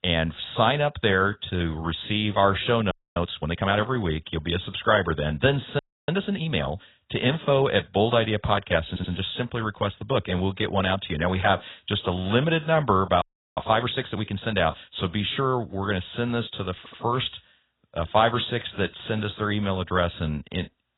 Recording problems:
garbled, watery; badly; nothing above 4 kHz
audio freezing; at 3 s, at 6 s and at 13 s
audio stuttering; at 9 s and at 17 s

